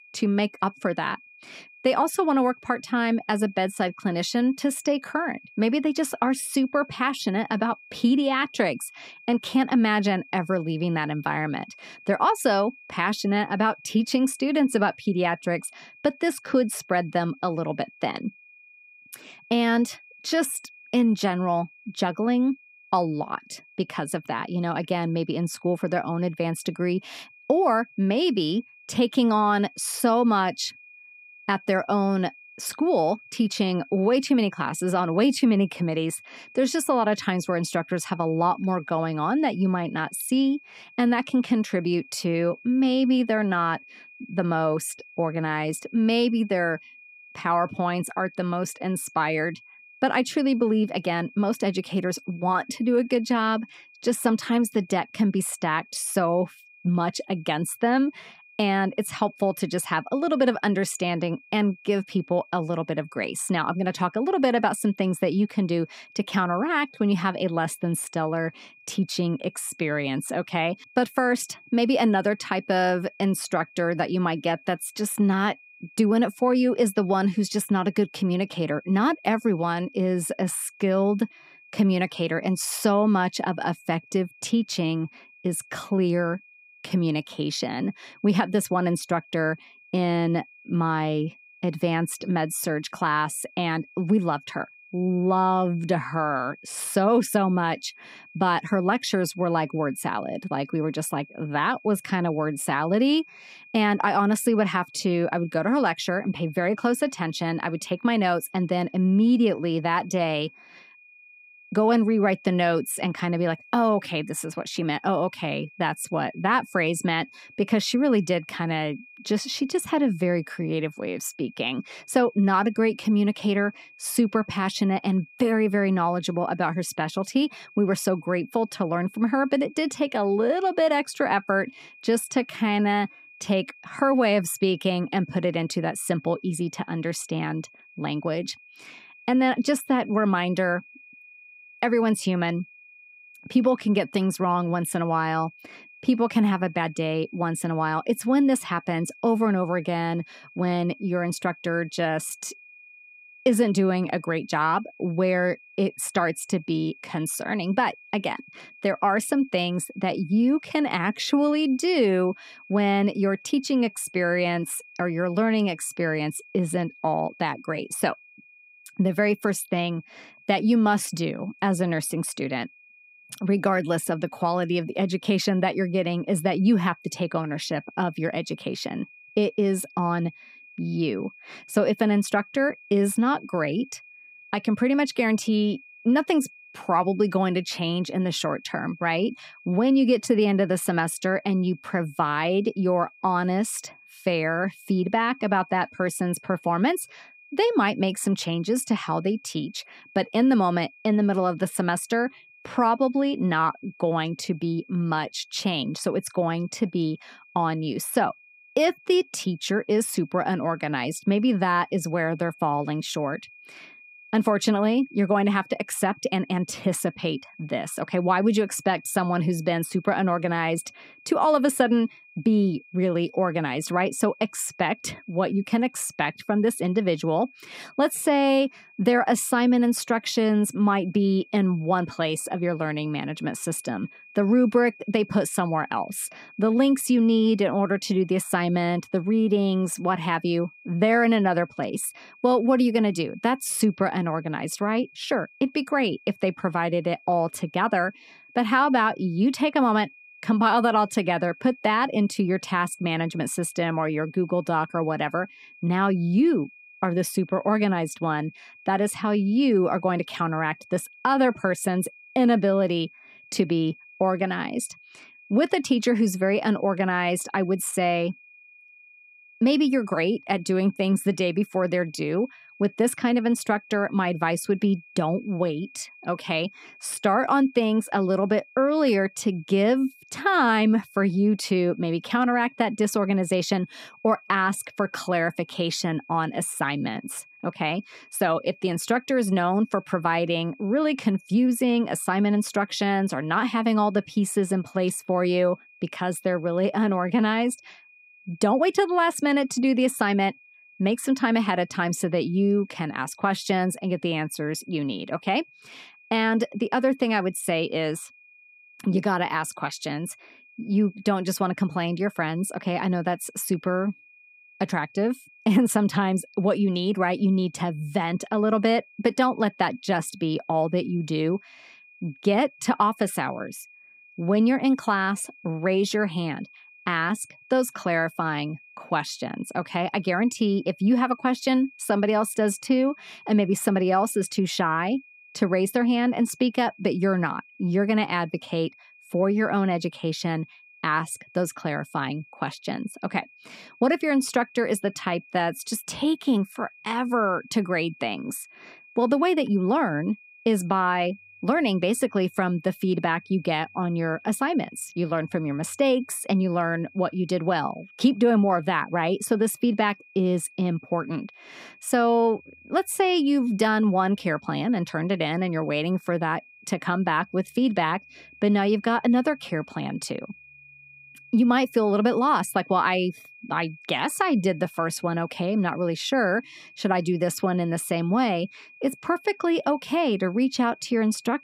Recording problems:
high-pitched whine; faint; throughout; 2.5 kHz, 25 dB below the speech

